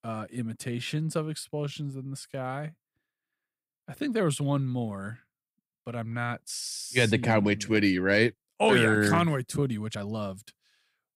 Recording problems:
uneven, jittery; slightly; from 0.5 to 10 s

